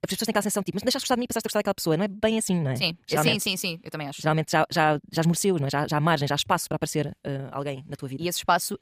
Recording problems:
wrong speed, natural pitch; too fast; 1.7 times normal speed

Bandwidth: 15 kHz